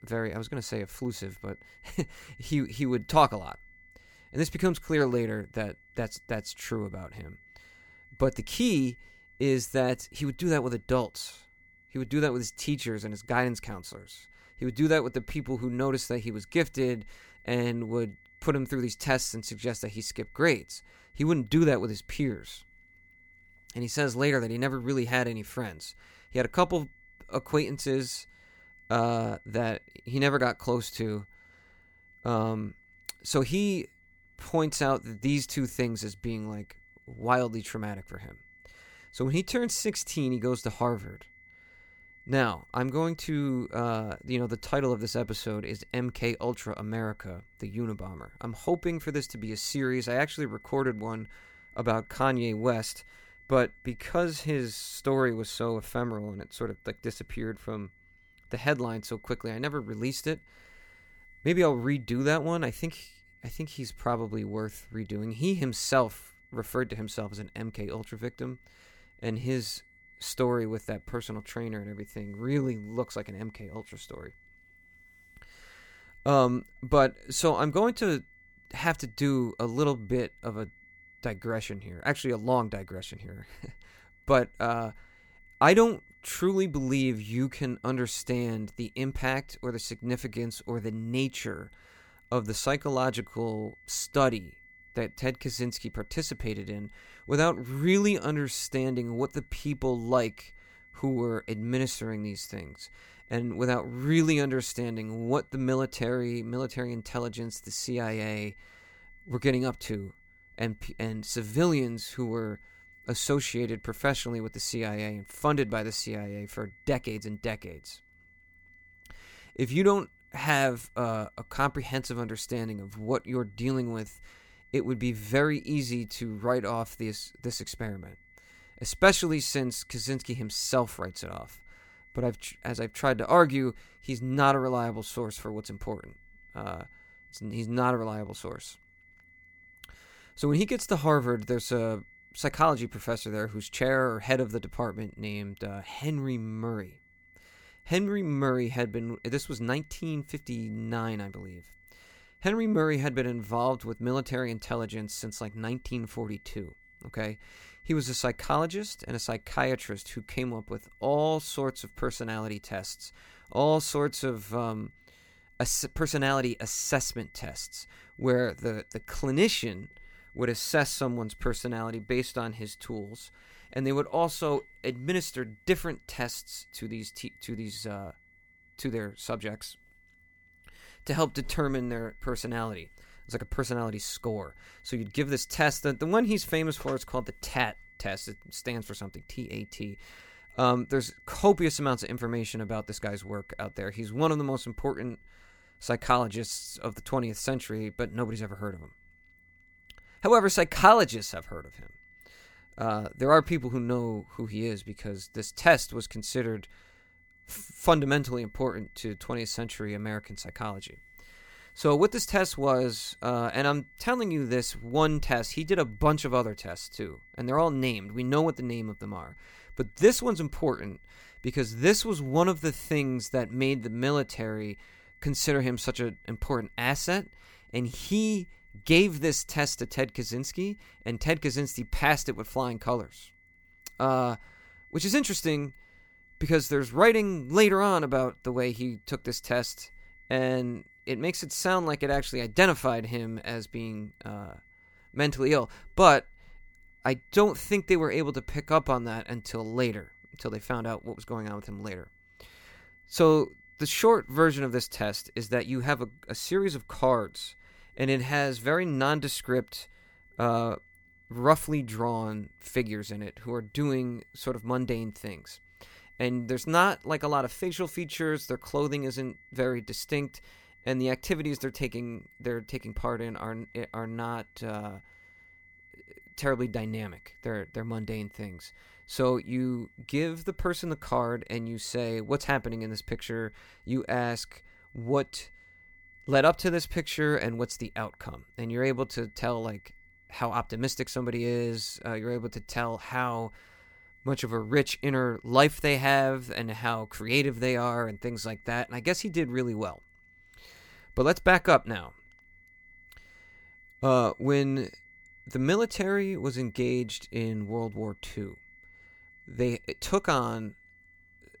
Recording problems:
high-pitched whine; faint; throughout; 2 kHz, 25 dB below the speech

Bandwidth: 18.5 kHz